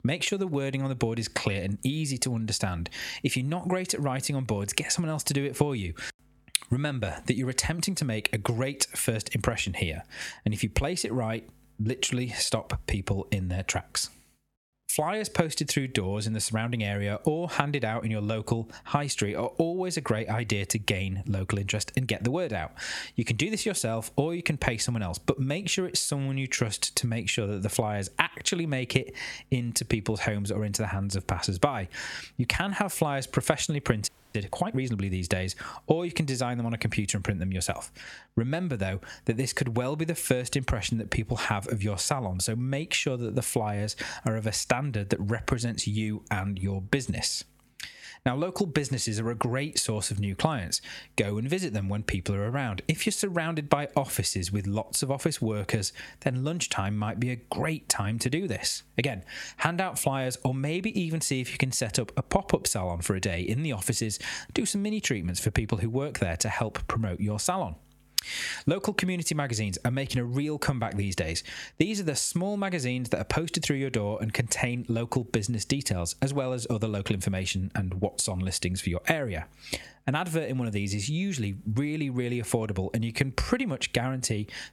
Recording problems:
squashed, flat; somewhat
audio freezing; at 34 s

